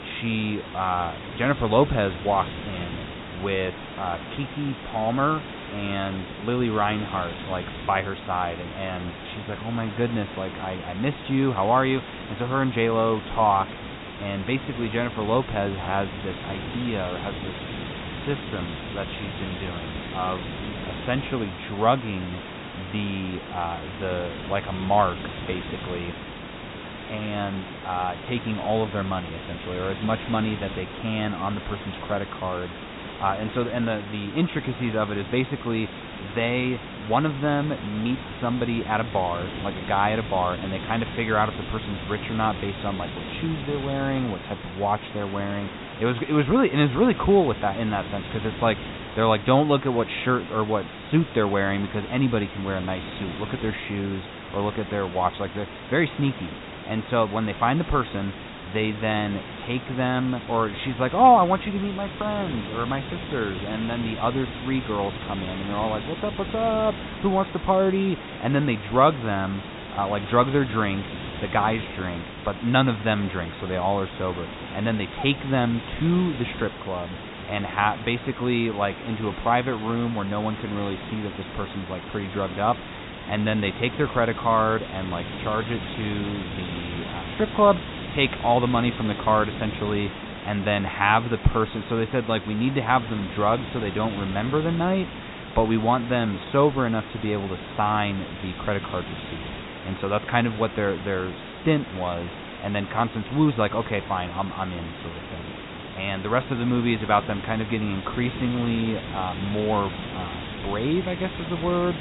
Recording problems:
high frequencies cut off; severe; nothing above 4 kHz
hiss; loud; throughout; 10 dB below the speech

